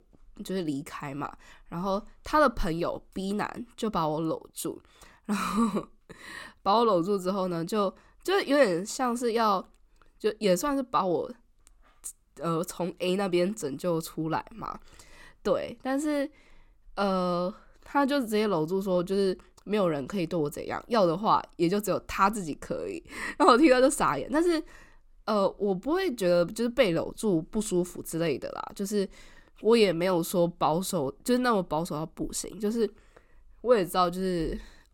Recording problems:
none

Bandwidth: 17.5 kHz